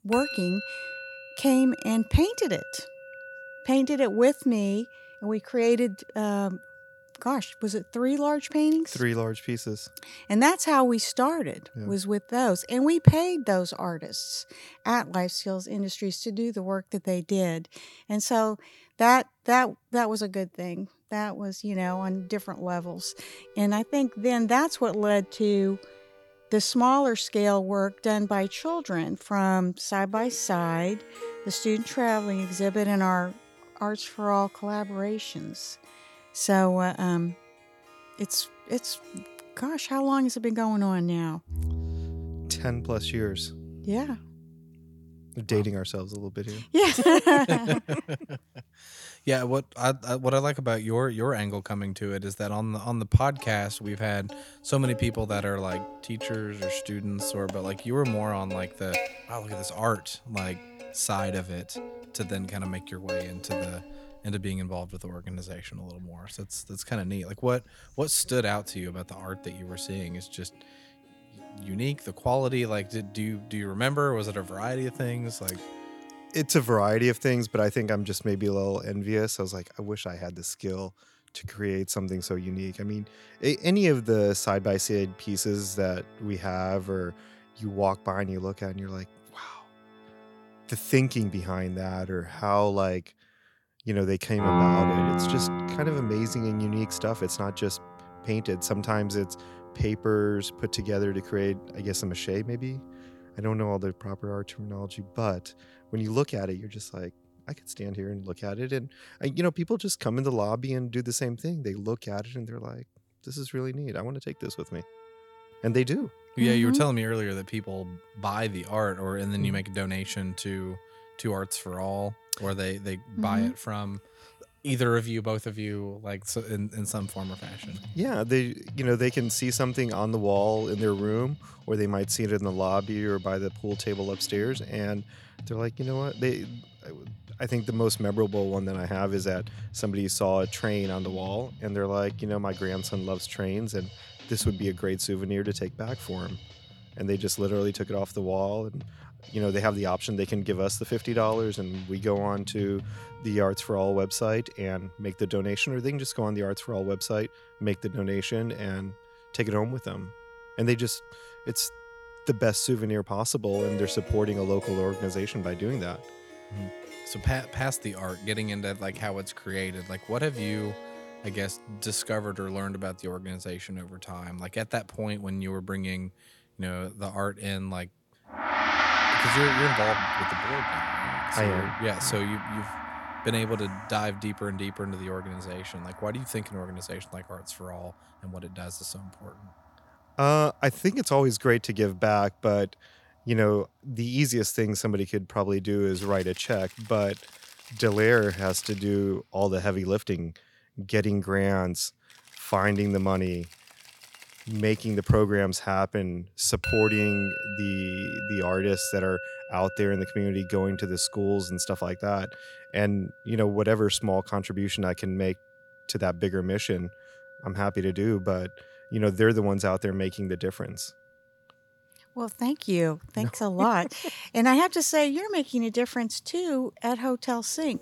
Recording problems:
background music; loud; throughout; 8 dB below the speech

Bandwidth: 18 kHz